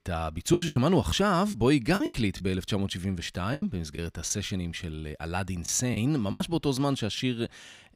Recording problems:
choppy; very; 7% of the speech affected

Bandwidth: 15.5 kHz